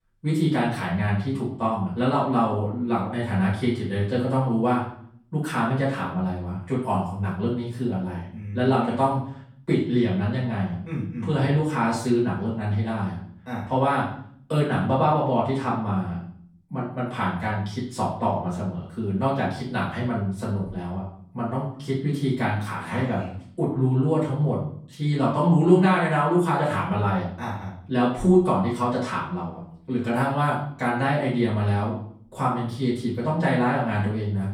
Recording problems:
off-mic speech; far
room echo; noticeable; dies away in 0.5 s

